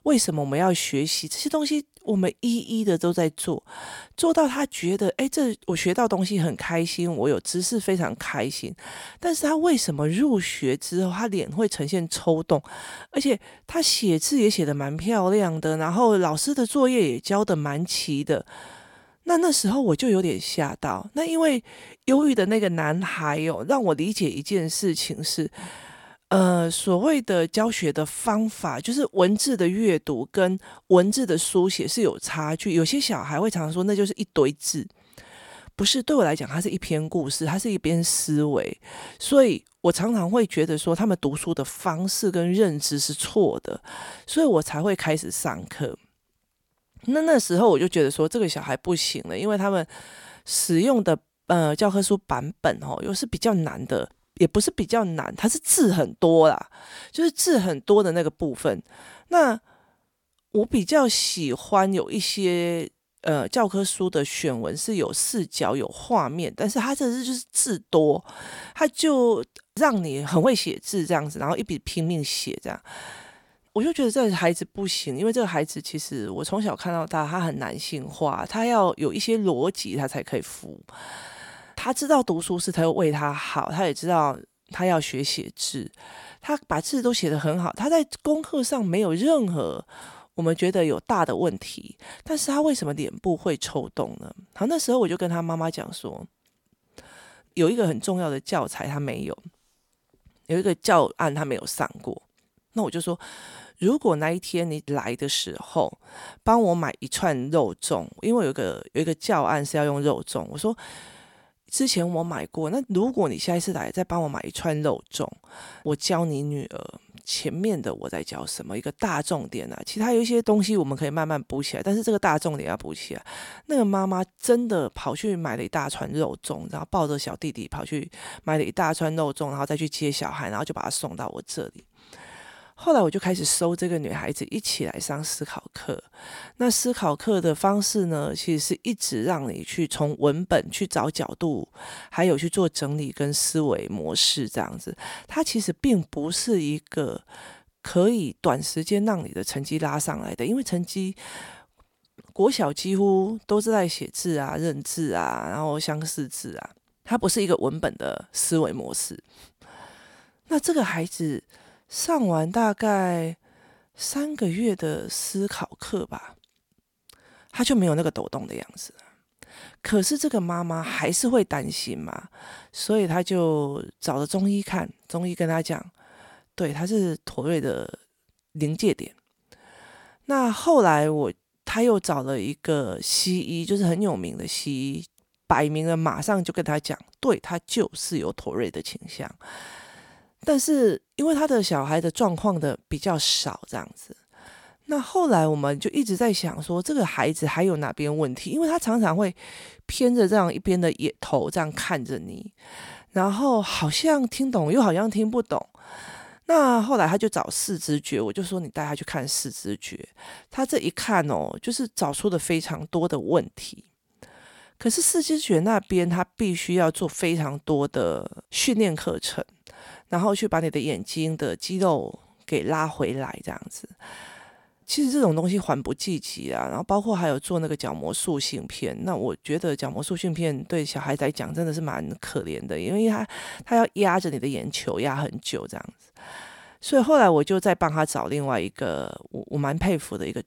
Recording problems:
none

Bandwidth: 17 kHz